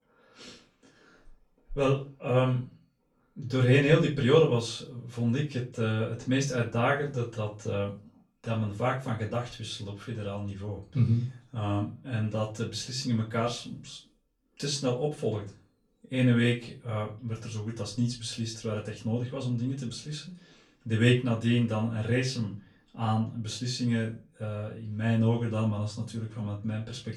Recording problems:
off-mic speech; far
room echo; very slight; dies away in 0.3 s

